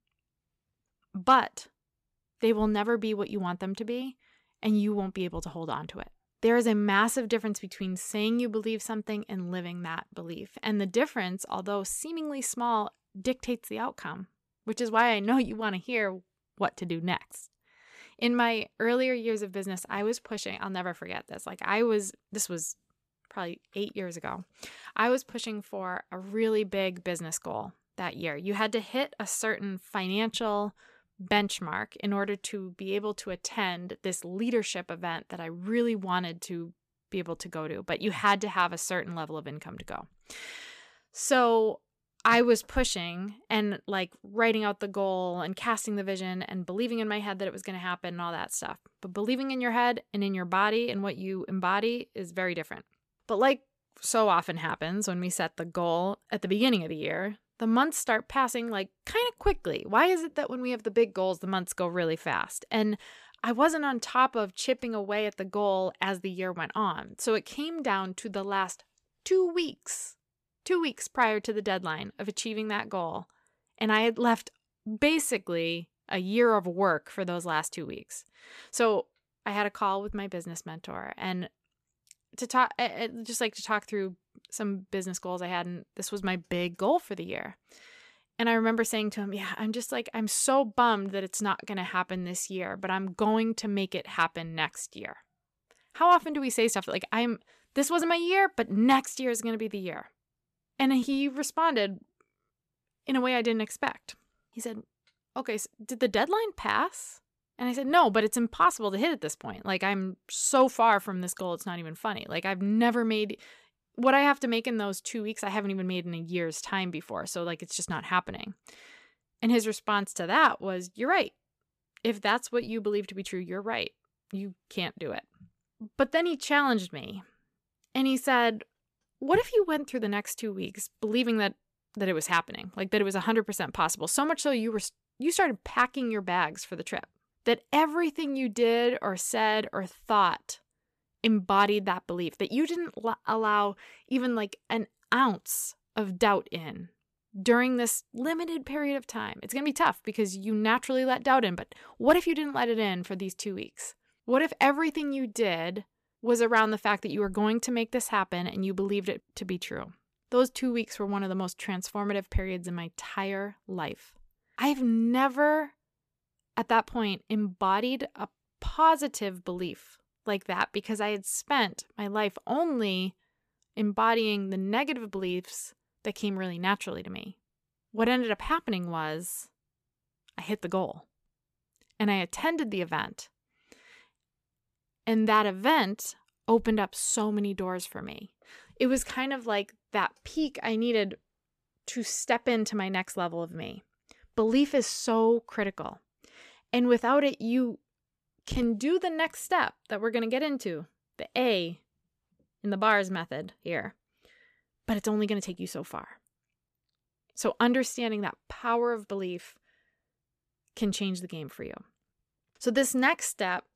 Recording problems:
none

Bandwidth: 14.5 kHz